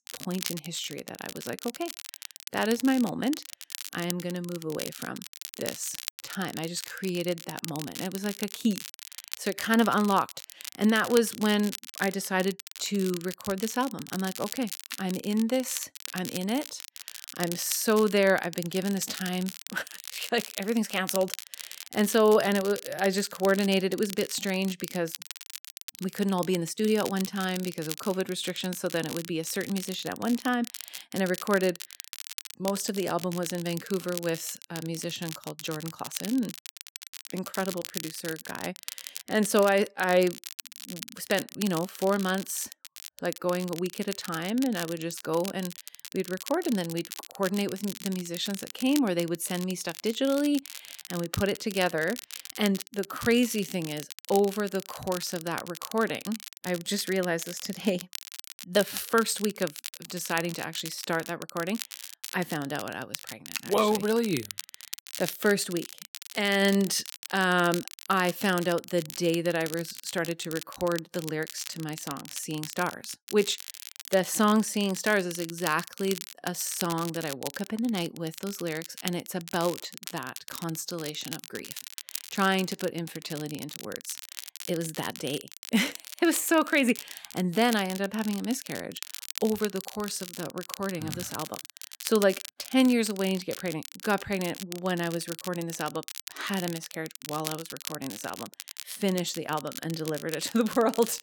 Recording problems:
crackle, like an old record; noticeable; 10 dB below the speech

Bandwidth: 18 kHz